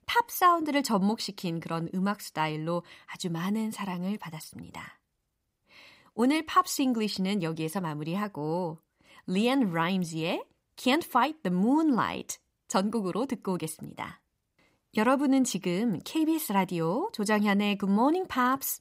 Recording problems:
none

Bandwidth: 15.5 kHz